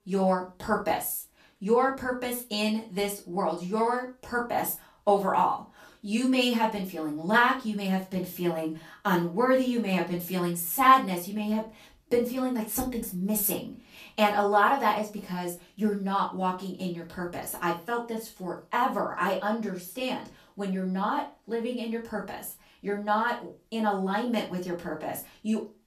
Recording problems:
off-mic speech; far
room echo; slight; dies away in 0.3 s

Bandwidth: 14.5 kHz